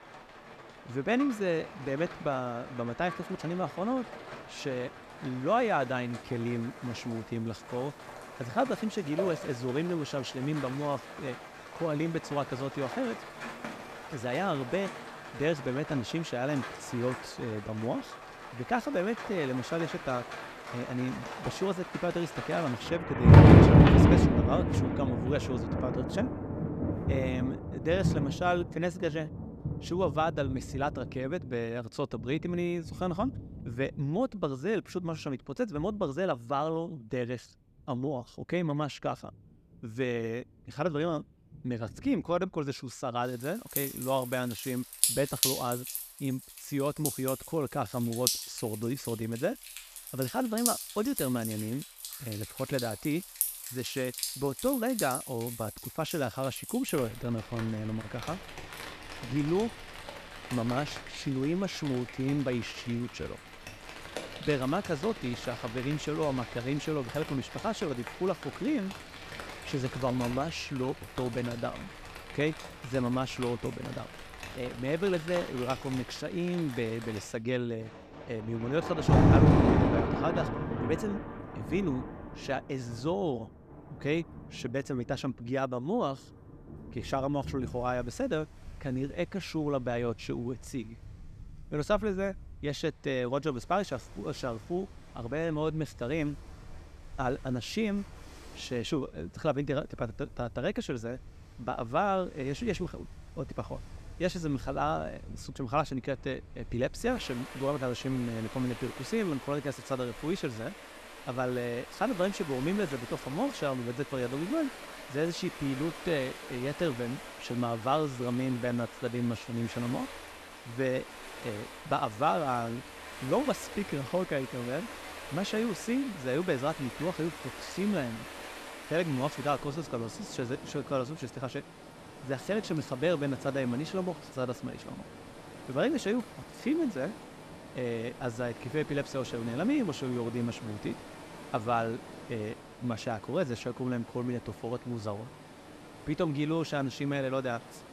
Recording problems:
rain or running water; very loud; throughout; 1 dB above the speech

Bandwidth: 14.5 kHz